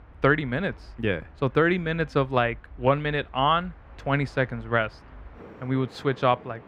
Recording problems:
muffled; slightly; fading above 4 kHz
train or aircraft noise; faint; throughout; 20 dB below the speech

